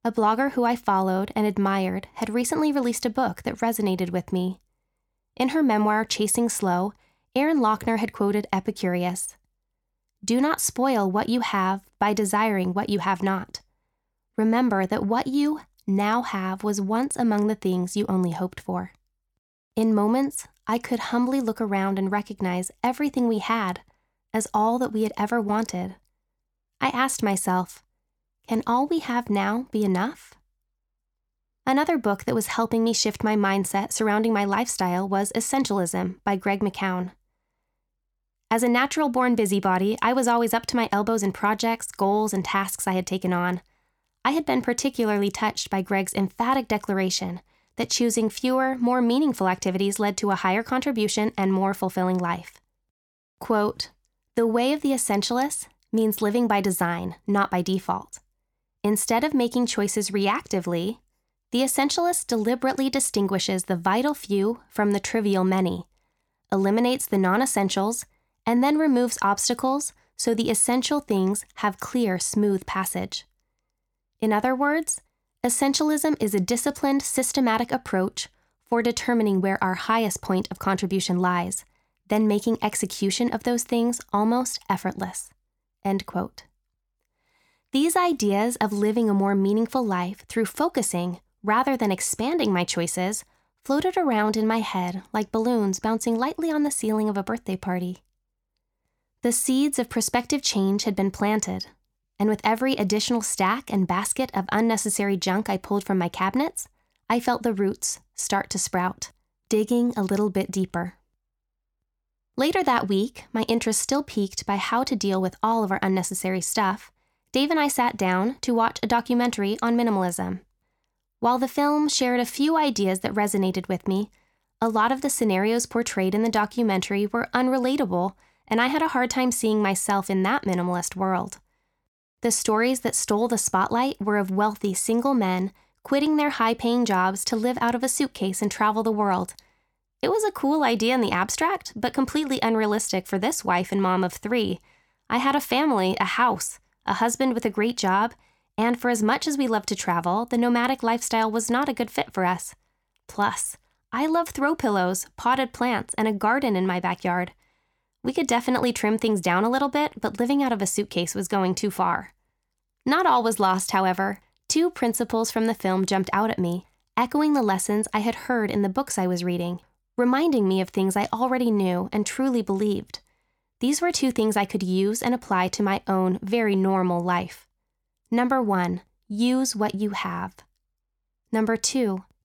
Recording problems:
none

